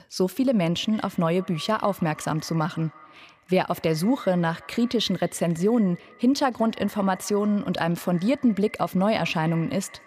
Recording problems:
echo of what is said; faint; throughout; 170 ms later, 20 dB below the speech

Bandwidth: 15 kHz